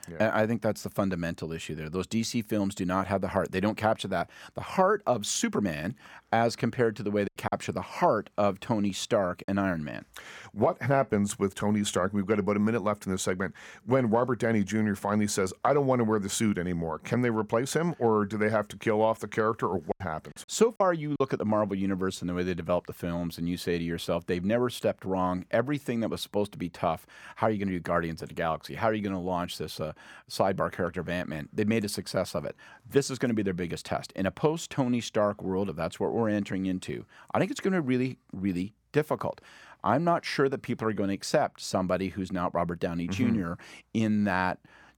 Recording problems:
choppy; very; from 7.5 to 9.5 s and from 20 to 21 s; 9% of the speech affected

